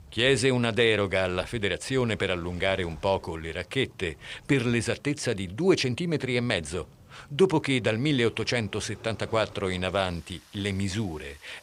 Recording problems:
rain or running water; faint; throughout; 25 dB below the speech

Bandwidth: 15.5 kHz